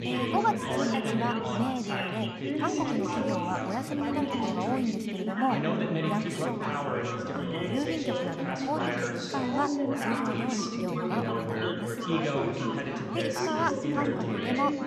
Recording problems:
chatter from many people; very loud; throughout; 3 dB above the speech

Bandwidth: 14.5 kHz